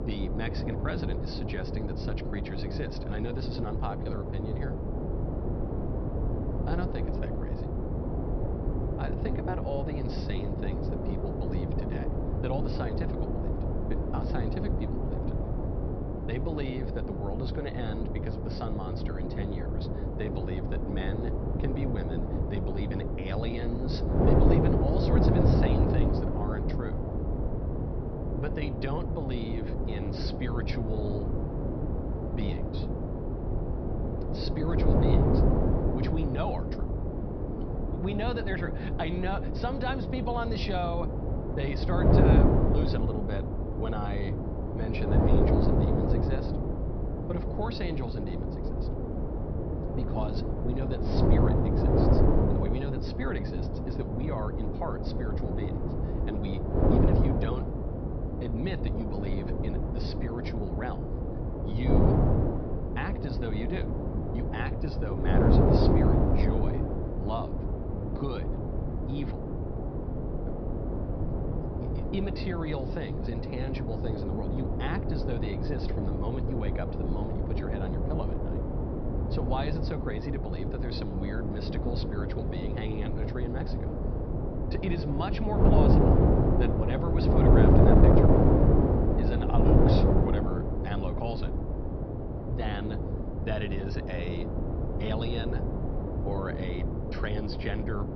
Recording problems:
high frequencies cut off; noticeable; nothing above 5.5 kHz
wind noise on the microphone; heavy; 3 dB above the speech
electrical hum; noticeable; throughout; 50 Hz, 10 dB below the speech

